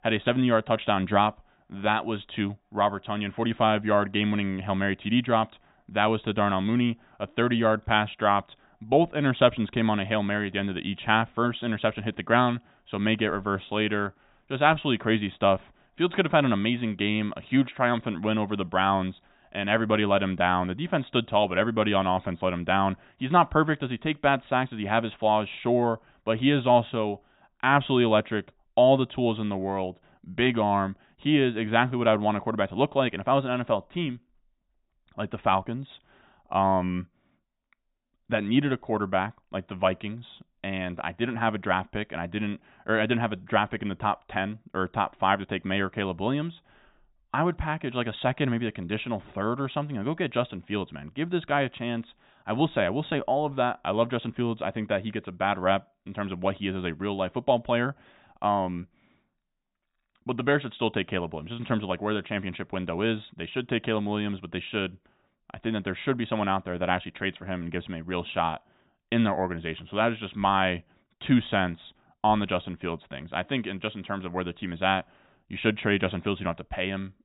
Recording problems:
high frequencies cut off; severe; nothing above 4 kHz

